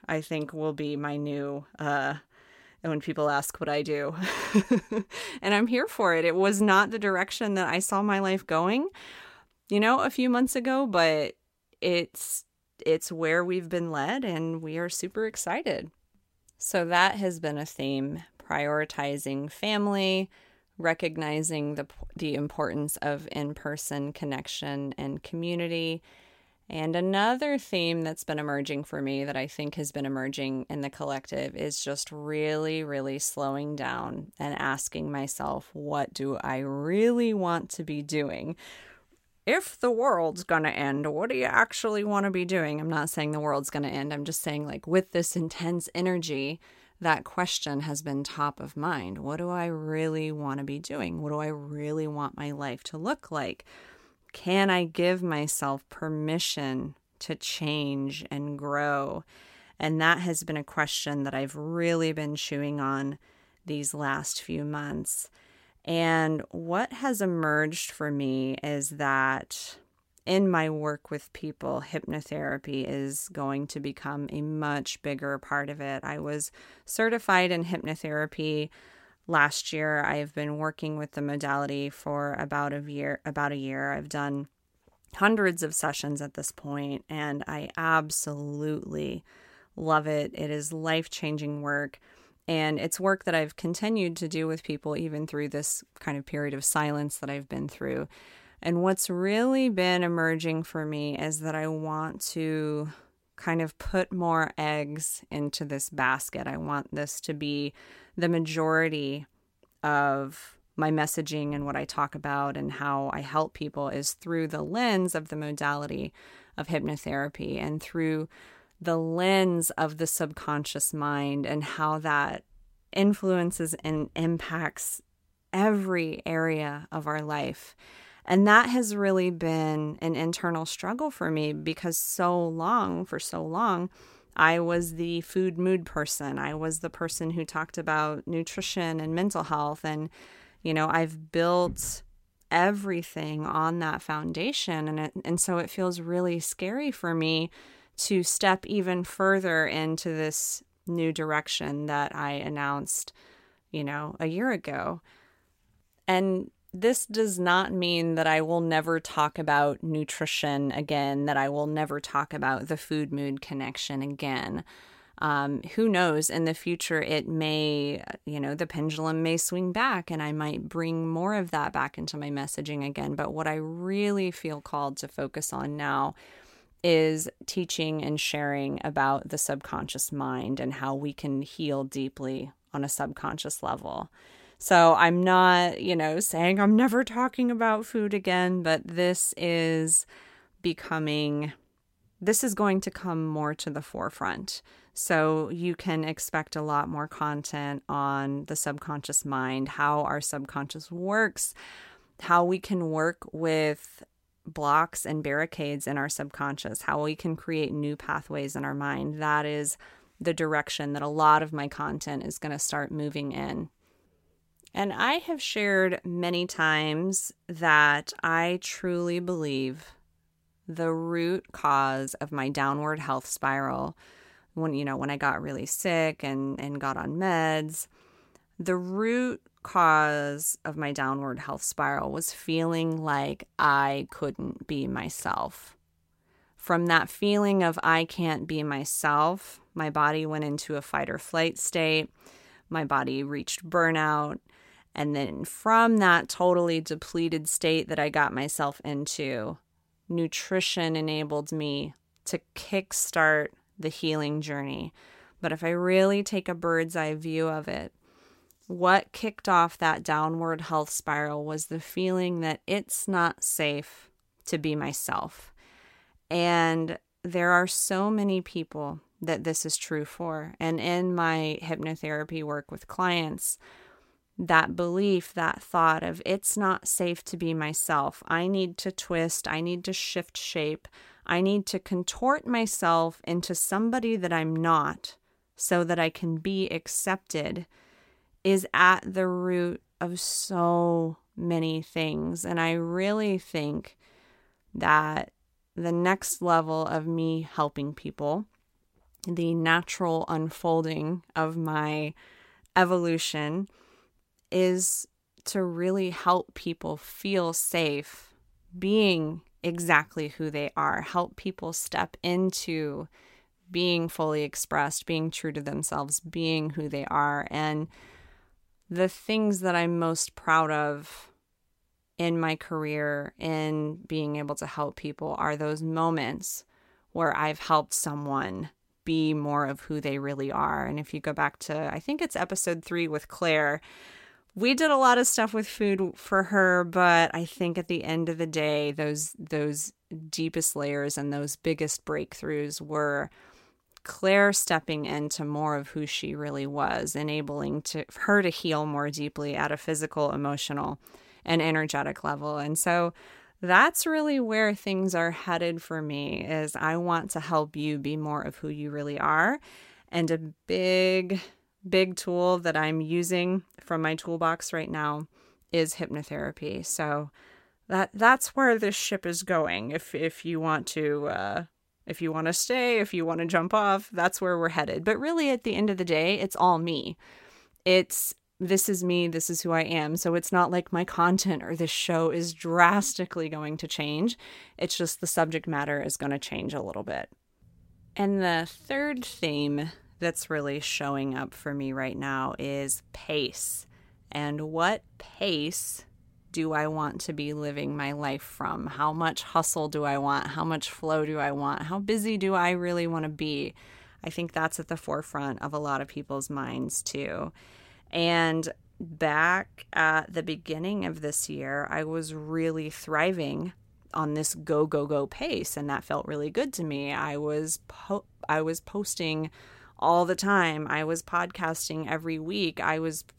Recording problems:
none

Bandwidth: 16 kHz